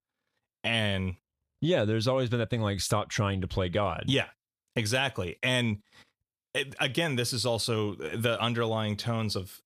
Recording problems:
none

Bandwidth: 14 kHz